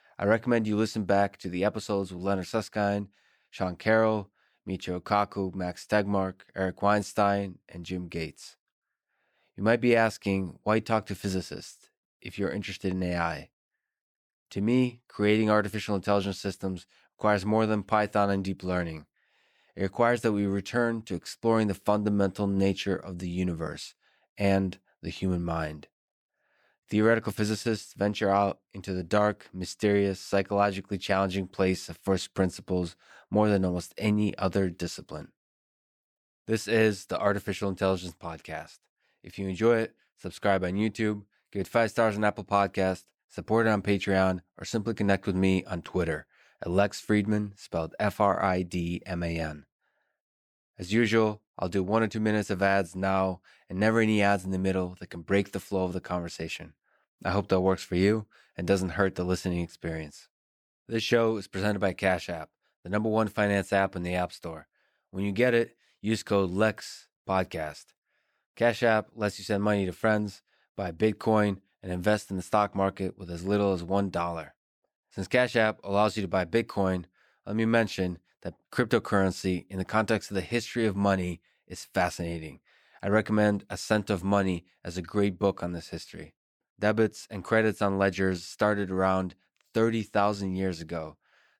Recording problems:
none

